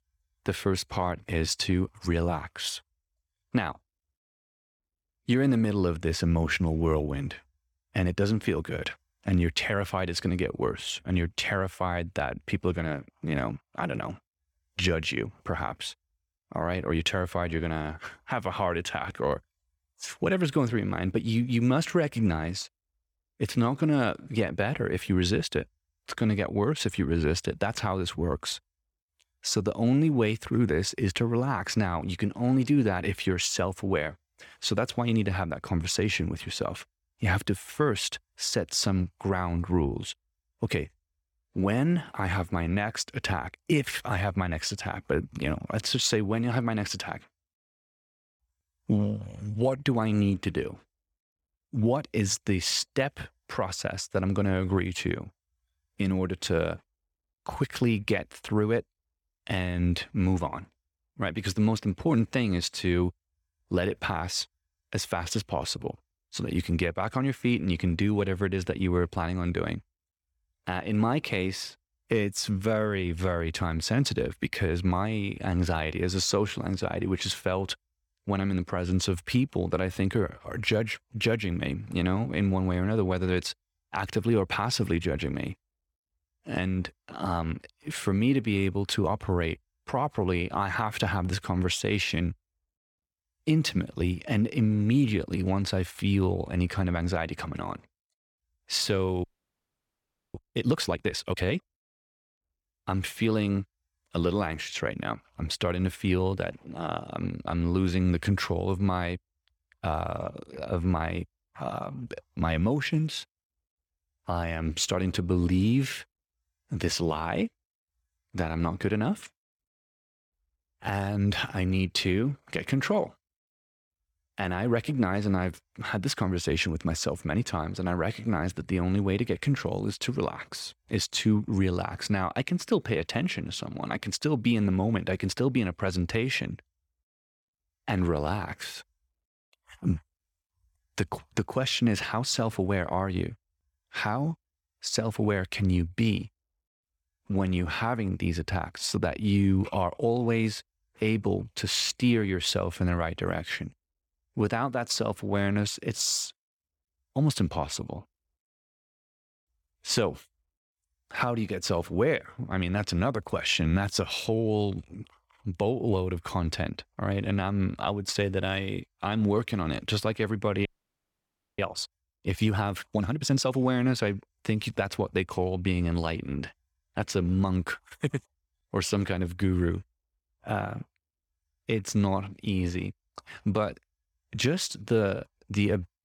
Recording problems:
audio freezing; at 1:39 for 1 s and at 2:51 for 1 s

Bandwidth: 17 kHz